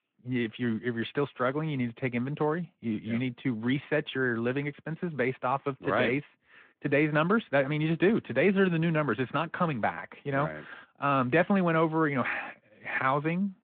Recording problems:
phone-call audio

